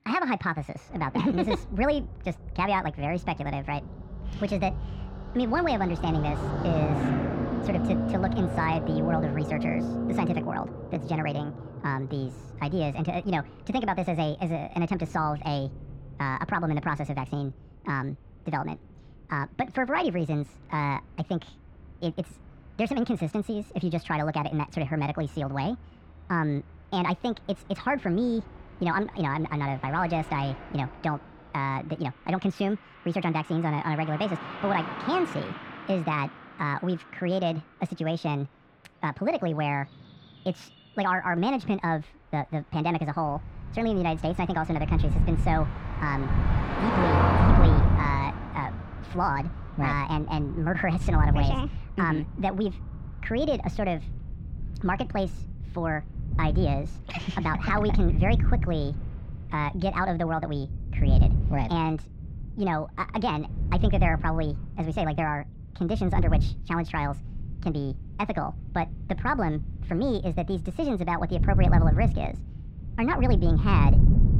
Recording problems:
wrong speed and pitch; too fast and too high; 1.5 times normal speed
muffled; slightly; fading above 2.5 kHz
traffic noise; loud; until 53 s; 2 dB below the speech
rain or running water; noticeable; throughout; 20 dB below the speech
wind noise on the microphone; occasional gusts; from 43 s on; 10 dB below the speech

